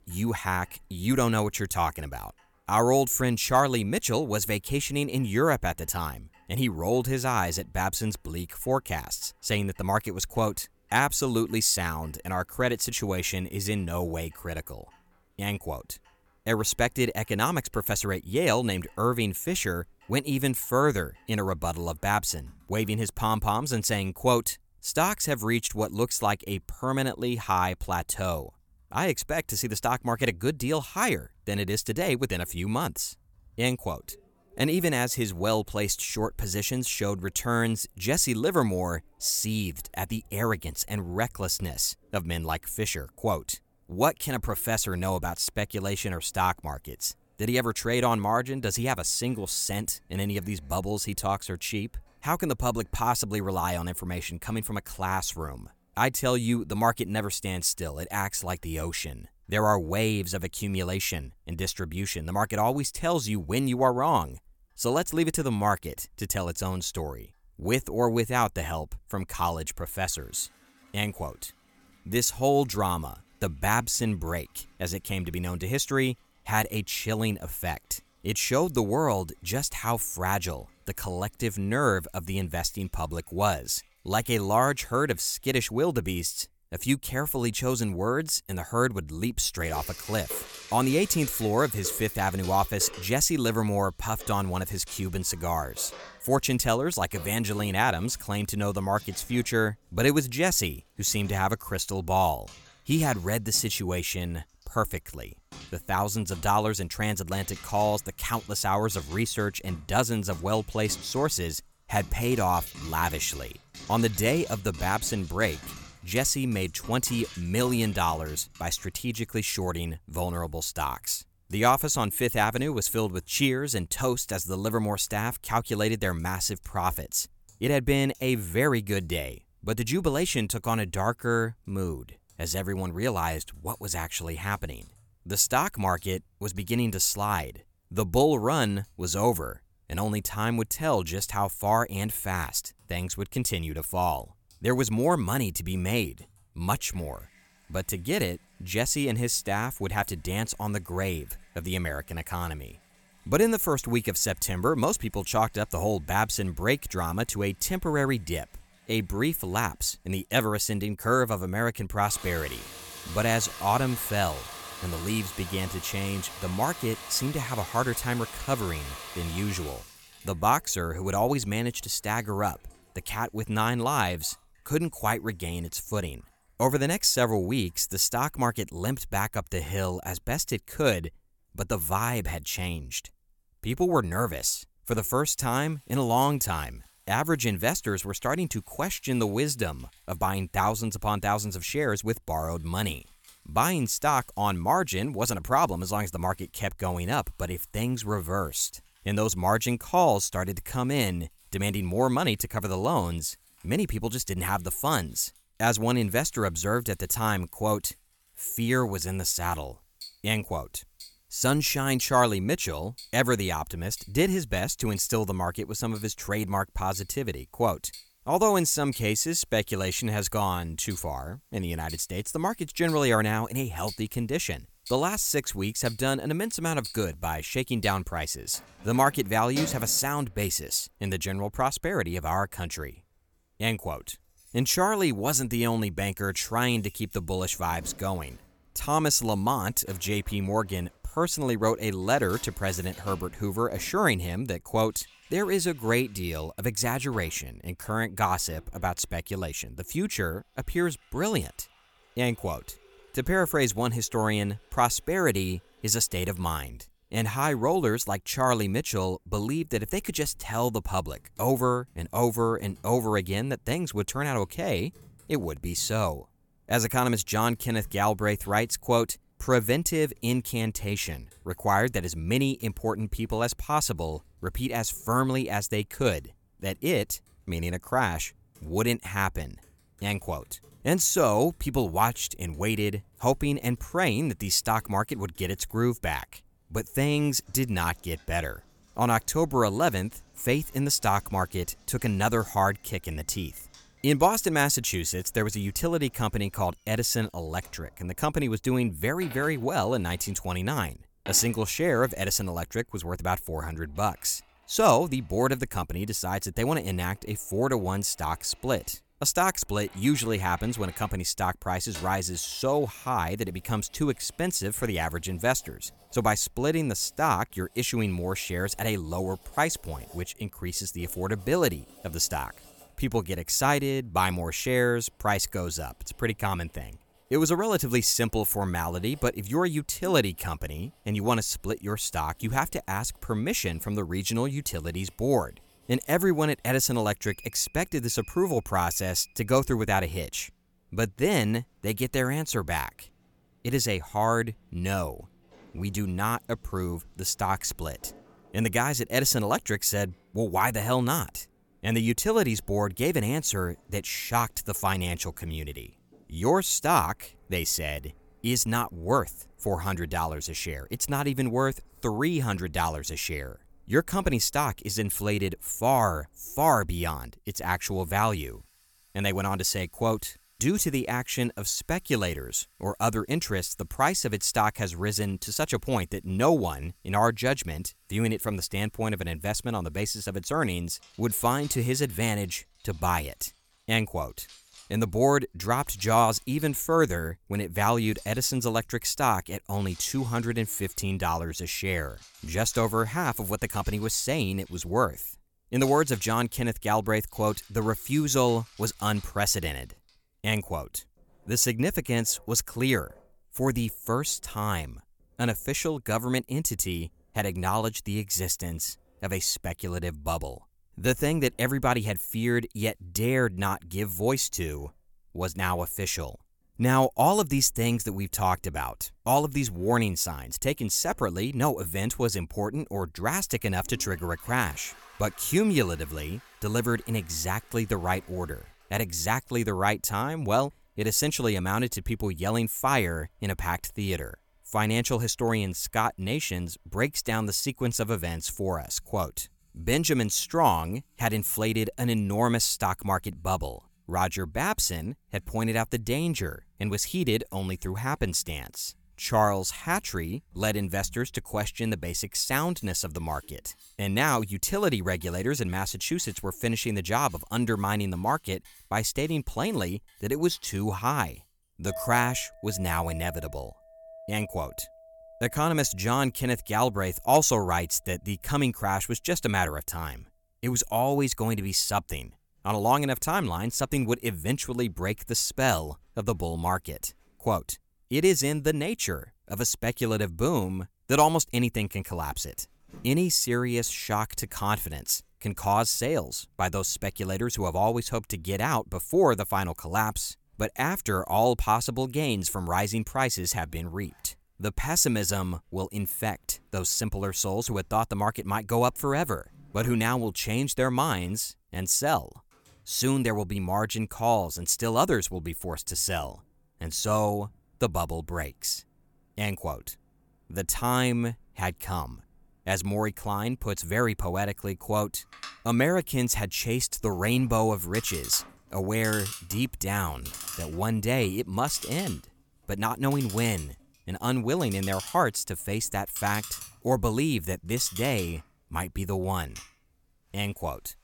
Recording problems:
household noises; faint; throughout; 20 dB below the speech

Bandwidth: 18 kHz